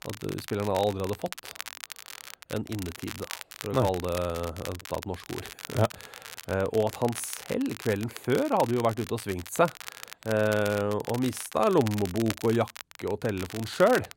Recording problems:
crackle, like an old record; noticeable; 10 dB below the speech

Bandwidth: 16 kHz